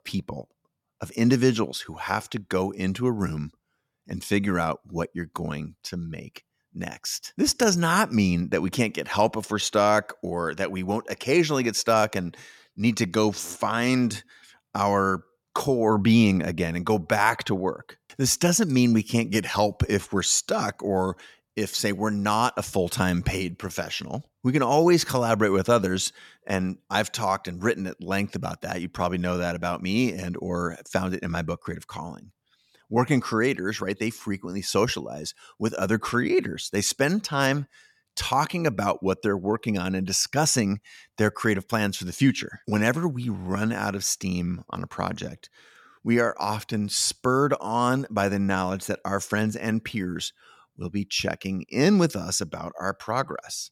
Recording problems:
none

